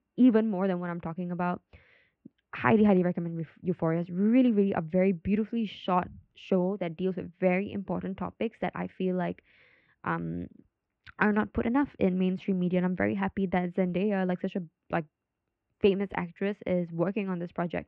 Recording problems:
muffled; very; fading above 2.5 kHz

